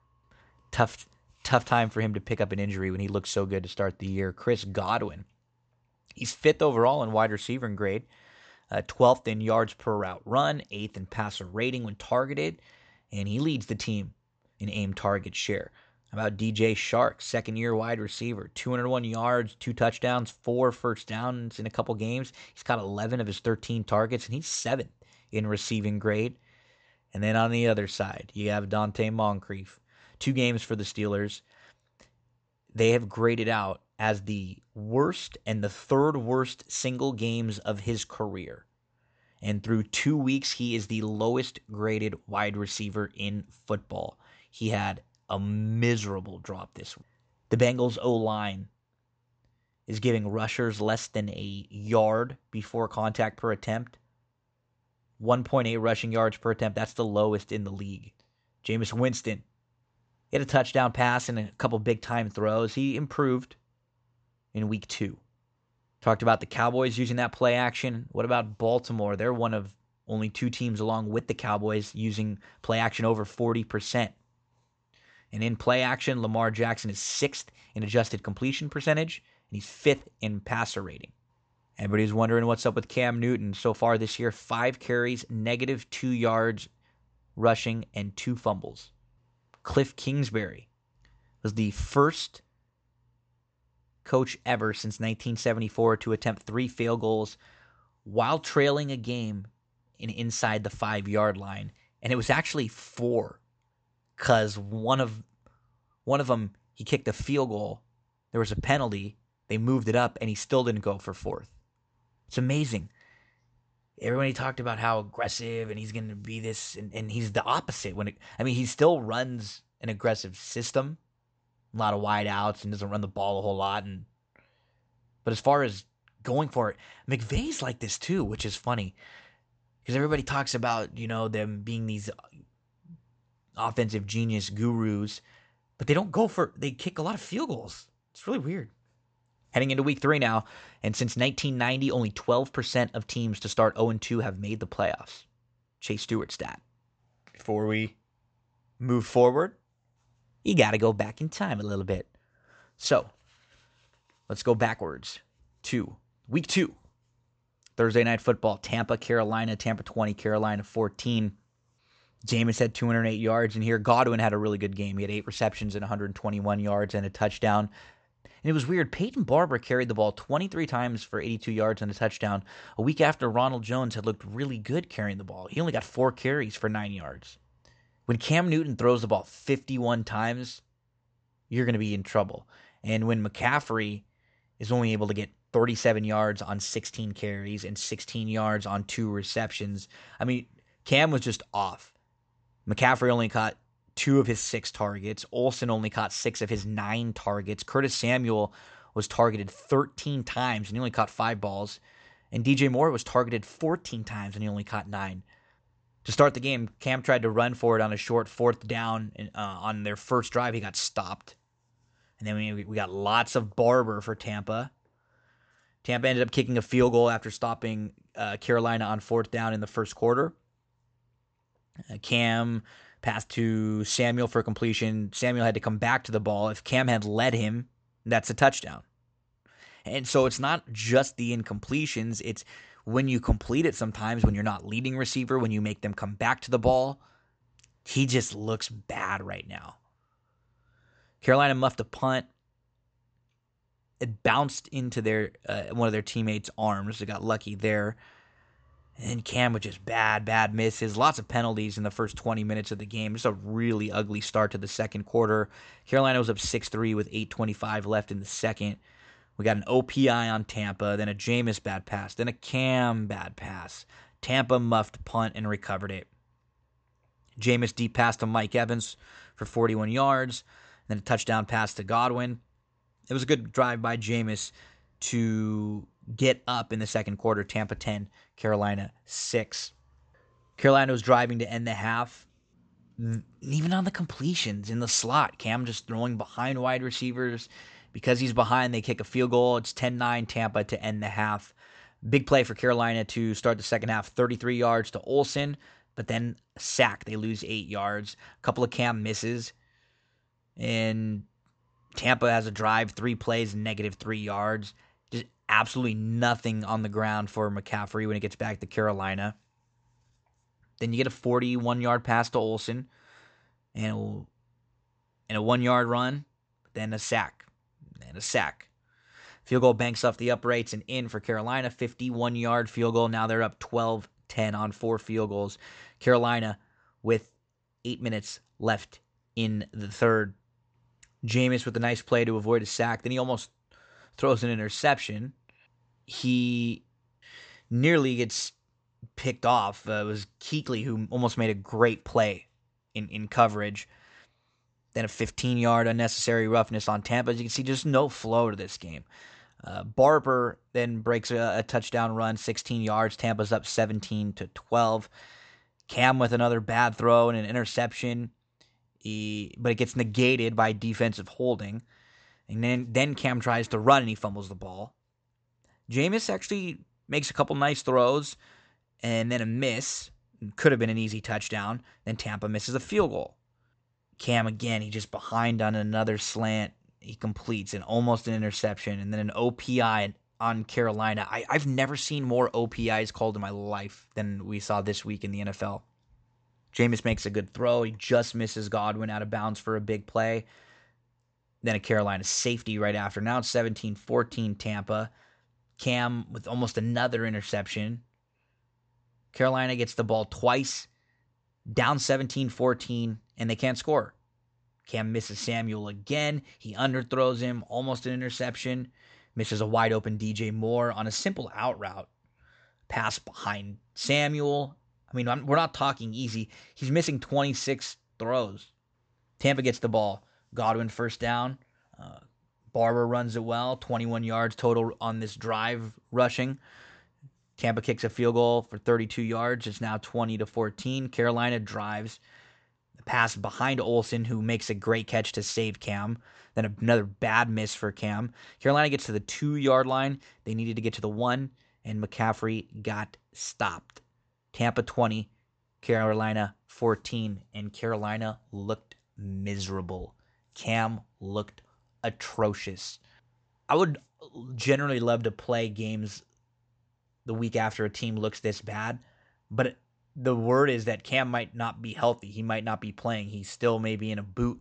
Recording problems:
high frequencies cut off; noticeable; nothing above 8 kHz

